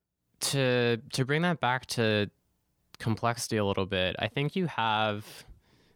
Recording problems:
none

